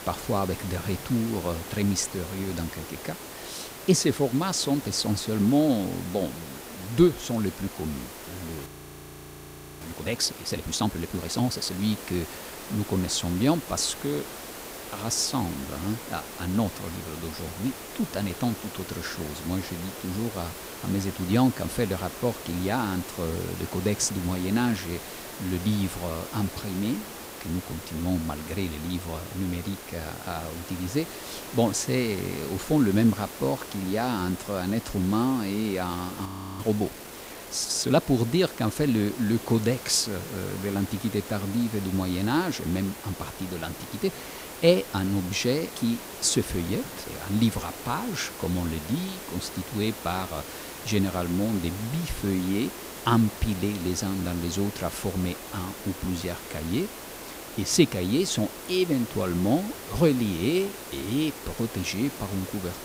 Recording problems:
hiss; noticeable; throughout; 10 dB below the speech
audio freezing; at 8.5 s for 1 s and at 36 s

